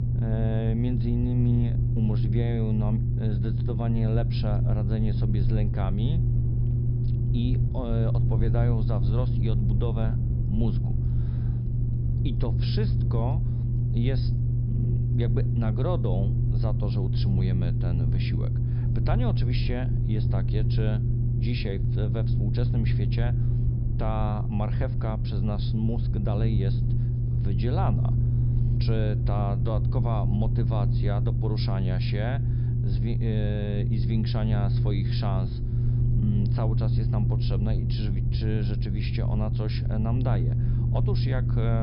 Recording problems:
high frequencies cut off; noticeable; nothing above 5.5 kHz
low rumble; loud; throughout; 2 dB below the speech
abrupt cut into speech; at the end

